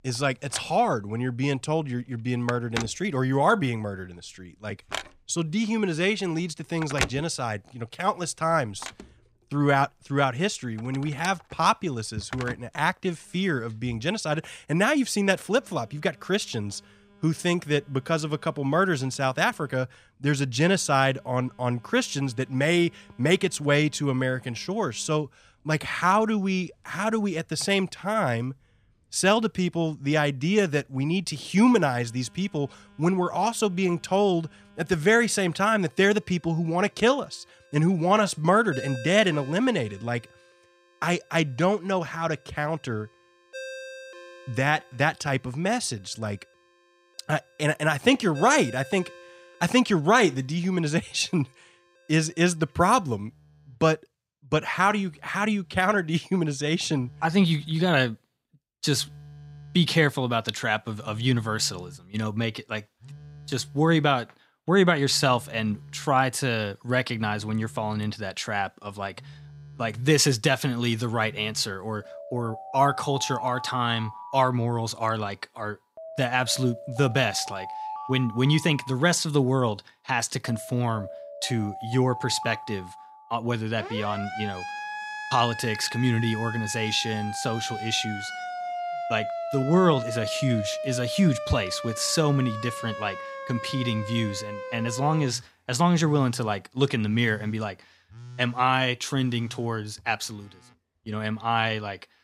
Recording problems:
alarms or sirens; noticeable; throughout; 10 dB below the speech

